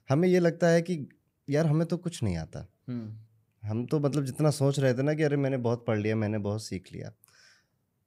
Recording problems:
none

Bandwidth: 15.5 kHz